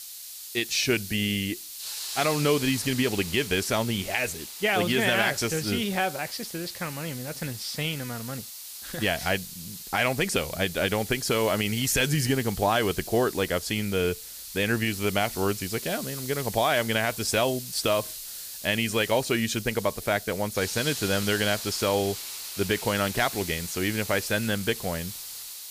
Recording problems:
hiss; loud; throughout; 9 dB below the speech

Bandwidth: 15 kHz